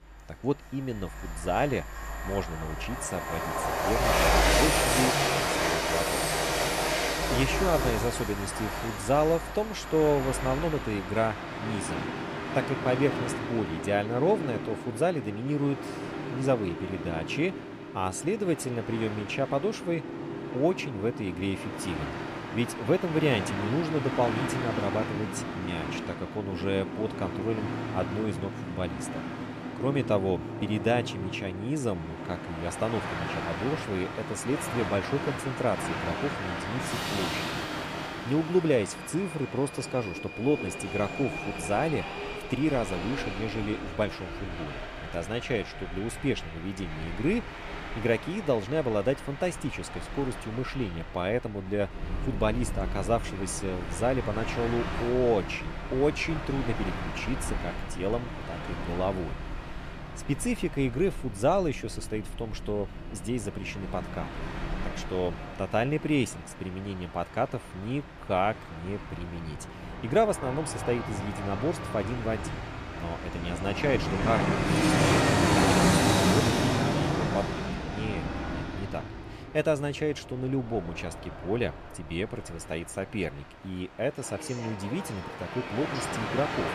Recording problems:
train or aircraft noise; loud; throughout; 1 dB below the speech

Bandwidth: 14.5 kHz